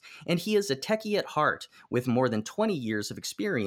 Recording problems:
abrupt cut into speech; at the end

